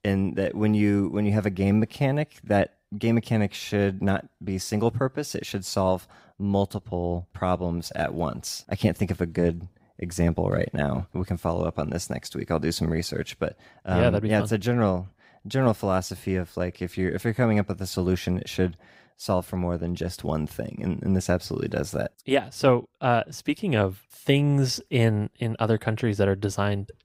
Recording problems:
none

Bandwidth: 15.5 kHz